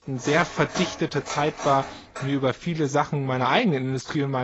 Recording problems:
garbled, watery; badly; nothing above 7.5 kHz
clattering dishes; noticeable; until 2.5 s; peak 8 dB below the speech
abrupt cut into speech; at the end

